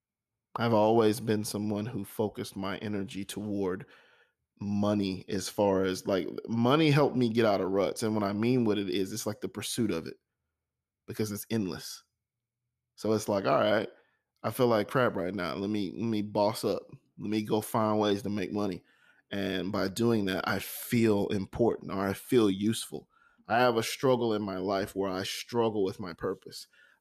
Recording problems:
none

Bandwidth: 14.5 kHz